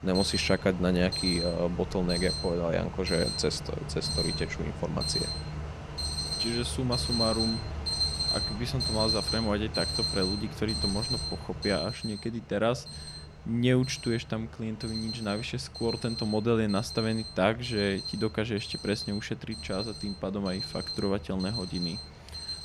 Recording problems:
alarms or sirens; loud; throughout; 2 dB below the speech

